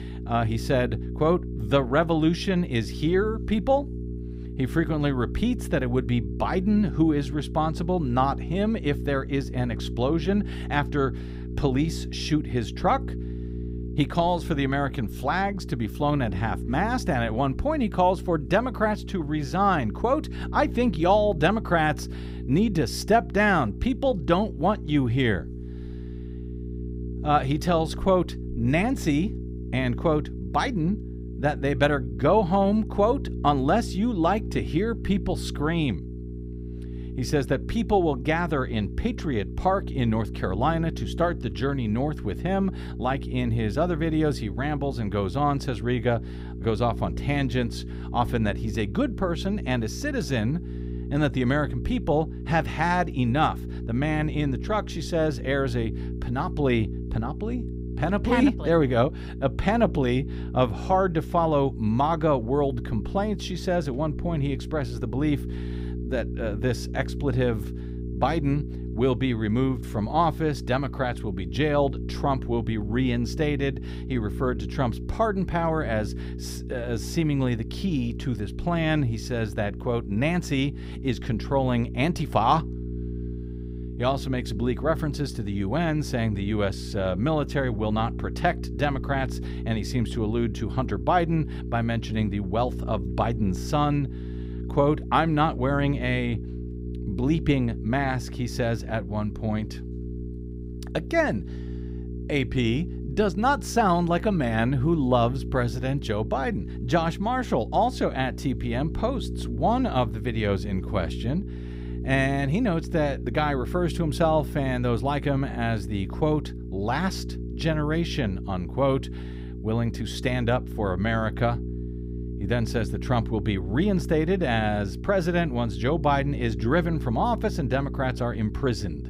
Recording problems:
electrical hum; noticeable; throughout; 60 Hz, 15 dB below the speech

